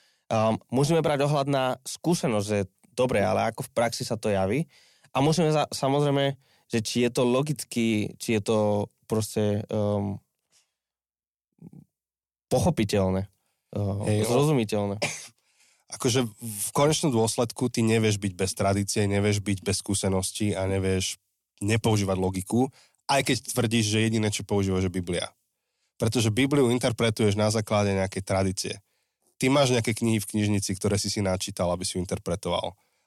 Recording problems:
none

